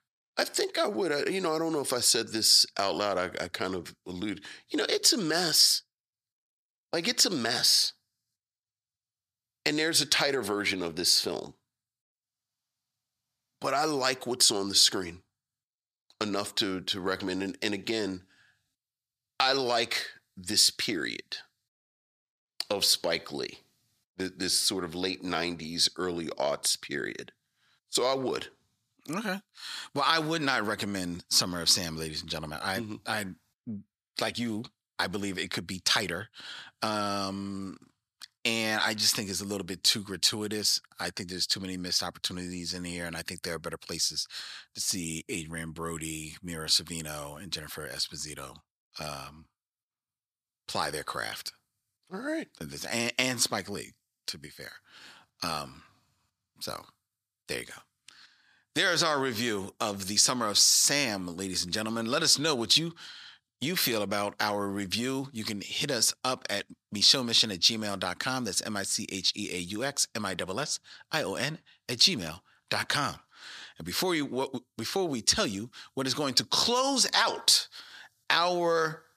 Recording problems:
thin; very slightly; fading below 500 Hz

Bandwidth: 14.5 kHz